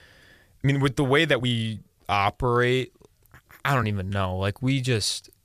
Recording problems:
uneven, jittery; strongly; from 0.5 to 5 s

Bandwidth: 14.5 kHz